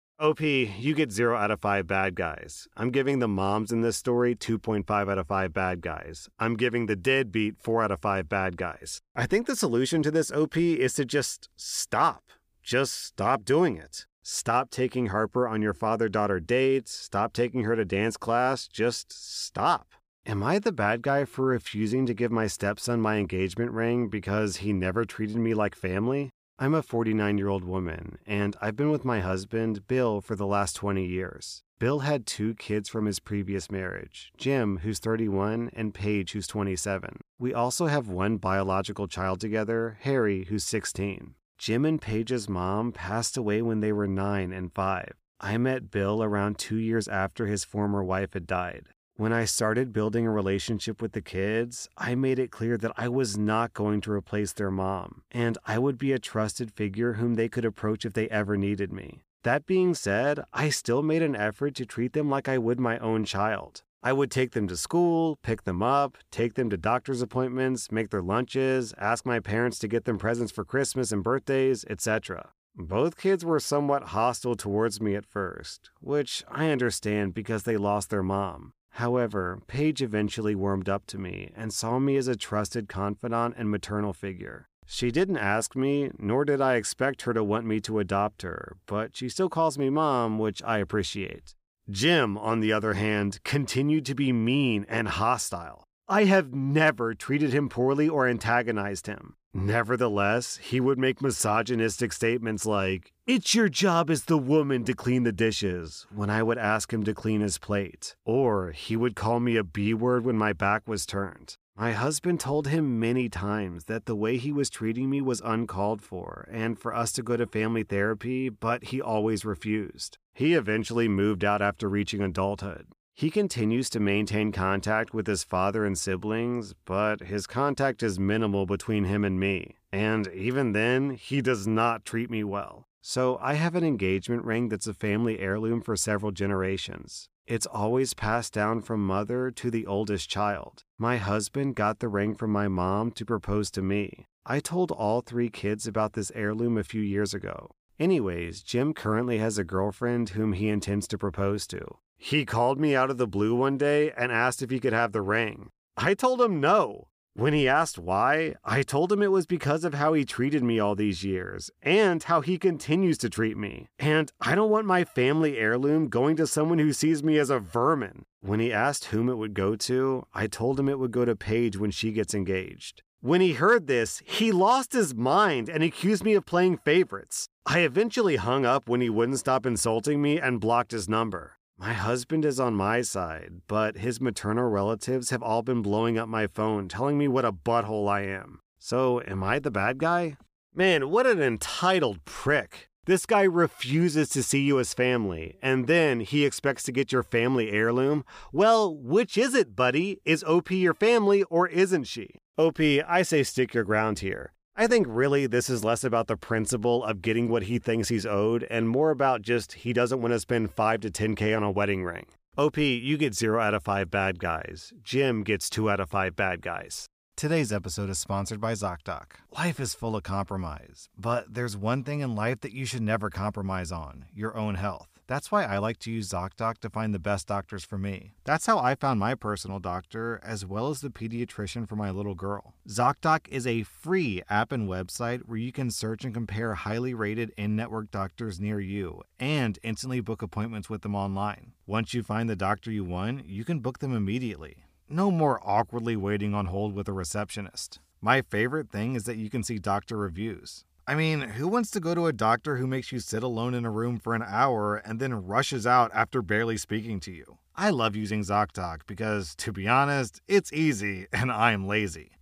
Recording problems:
none

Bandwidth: 15 kHz